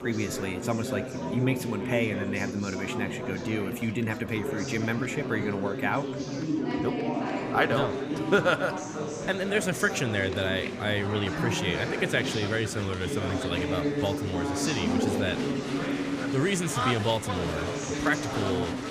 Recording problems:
murmuring crowd; loud; throughout; 2 dB below the speech

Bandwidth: 15 kHz